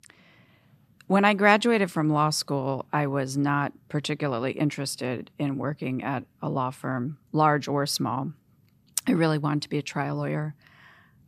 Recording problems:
none

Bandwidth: 15 kHz